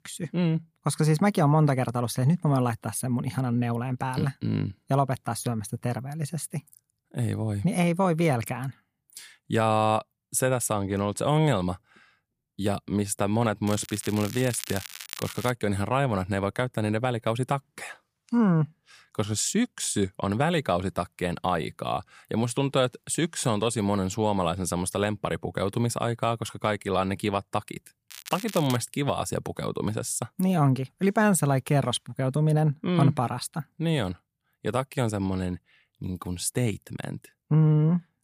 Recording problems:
crackling; noticeable; from 14 to 16 s and at 28 s; 10 dB below the speech

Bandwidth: 15 kHz